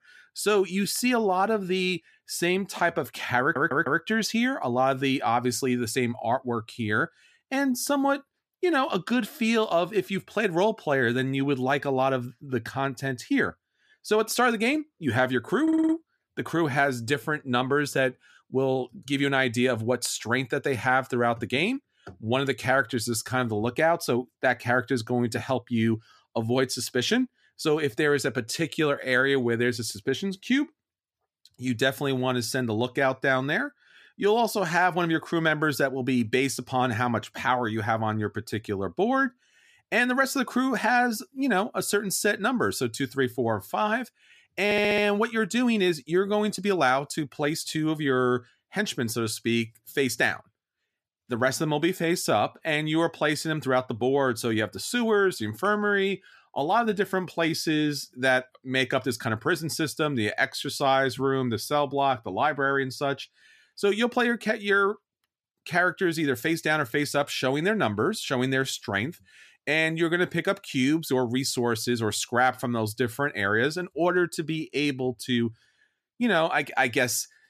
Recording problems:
audio stuttering; at 3.5 s, at 16 s and at 45 s

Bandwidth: 14.5 kHz